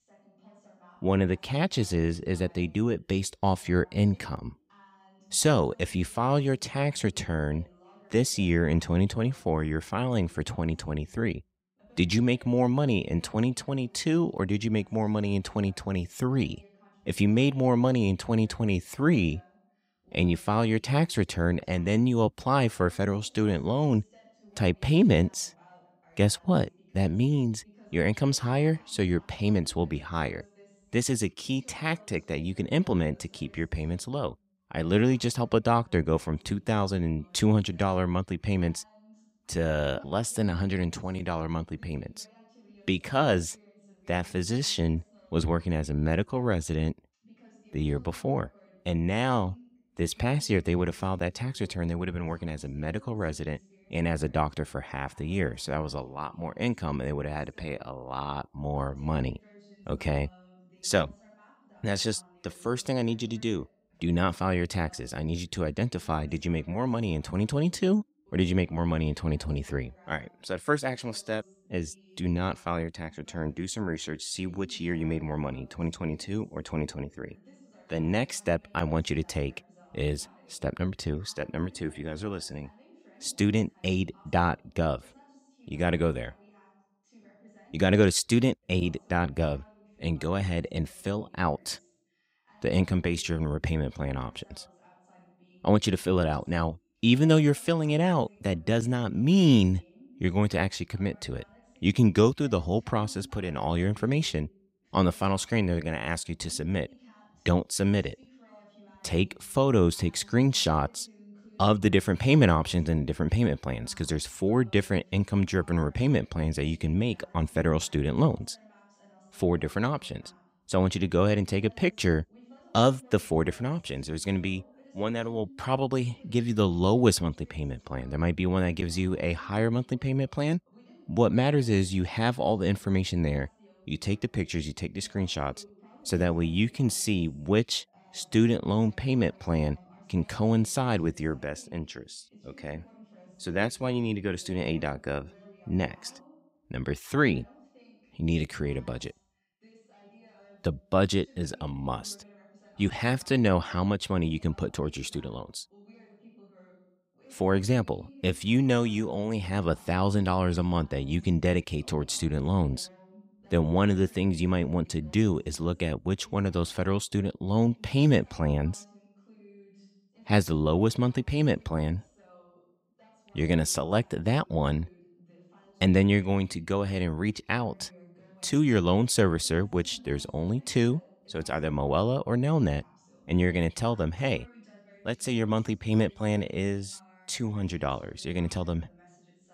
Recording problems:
voice in the background; faint; throughout; 30 dB below the speech

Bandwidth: 15.5 kHz